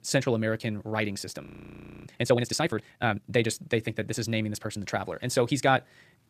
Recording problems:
wrong speed, natural pitch; too fast; 1.5 times normal speed
audio freezing; at 1.5 s for 0.5 s

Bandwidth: 14.5 kHz